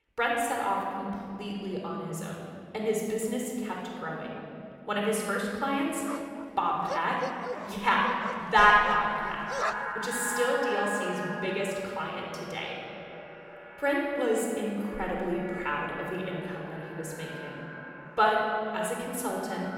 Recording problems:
echo of what is said; strong; from 9 s on; 470 ms later, 9 dB below the speech
room echo; noticeable; dies away in 2.4 s
off-mic speech; somewhat distant
dog barking; noticeable; from 6 to 10 s; peak 3 dB below the speech

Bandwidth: 17 kHz